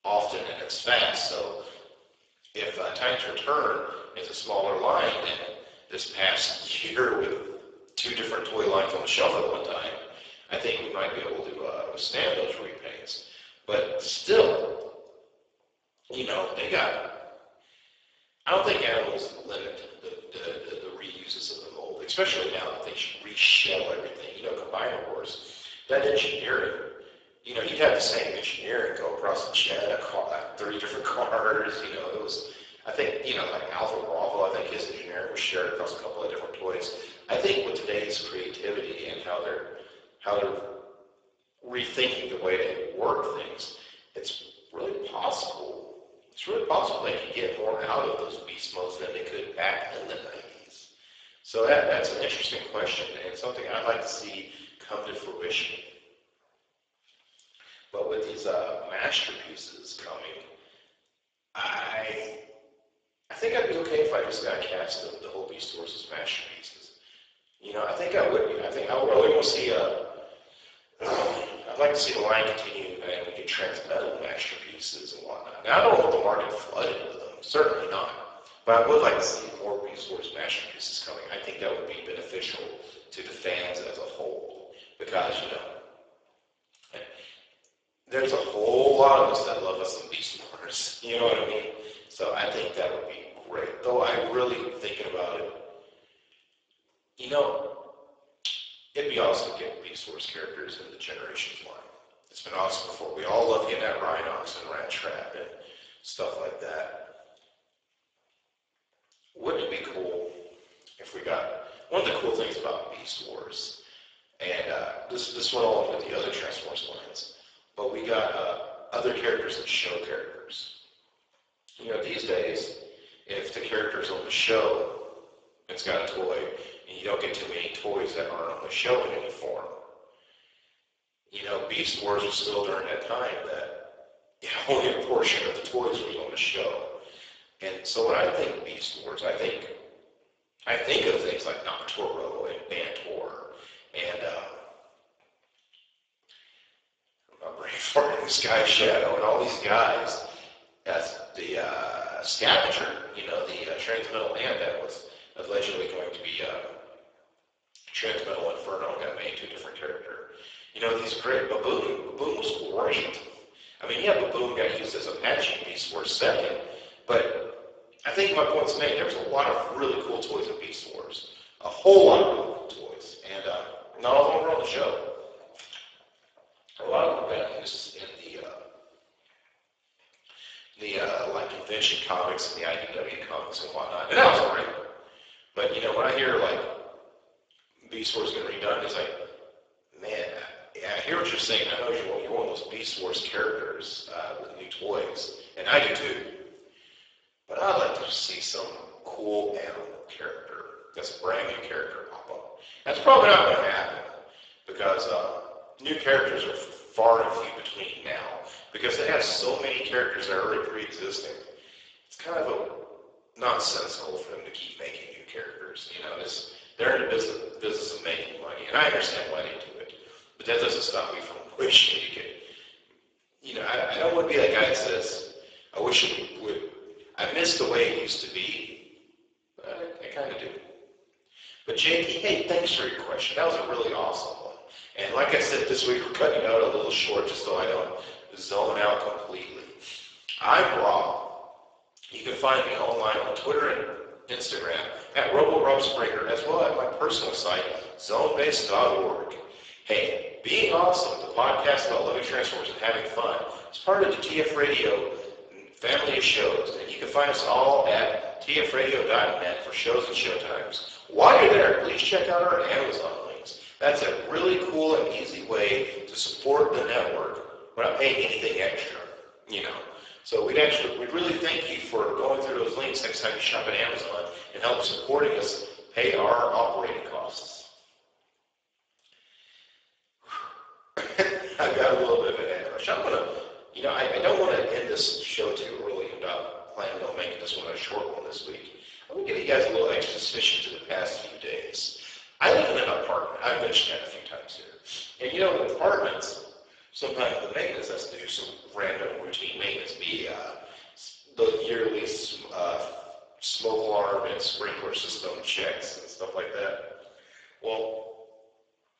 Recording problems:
garbled, watery; badly; nothing above 7.5 kHz
thin; very; fading below 350 Hz
room echo; noticeable; dies away in 0.9 s
off-mic speech; somewhat distant

